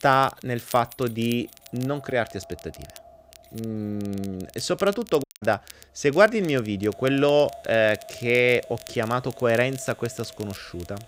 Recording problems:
echo of what is said; faint; throughout; 500 ms later, 25 dB below the speech
household noises; faint; throughout; 25 dB below the speech
crackle, like an old record; faint; 20 dB below the speech
audio cutting out; at 5 s

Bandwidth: 15.5 kHz